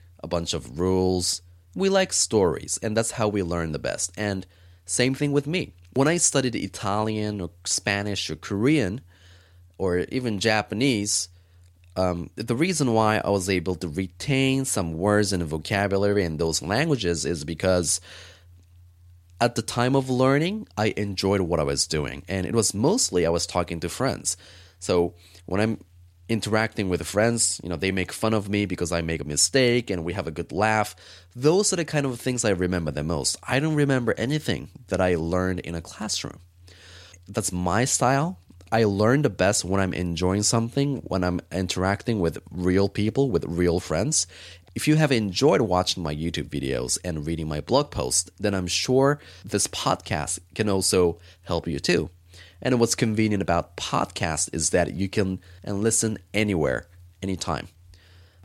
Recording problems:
none

